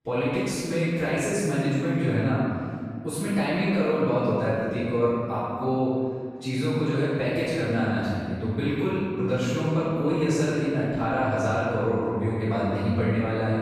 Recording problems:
room echo; strong; dies away in 2.4 s
off-mic speech; far

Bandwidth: 14.5 kHz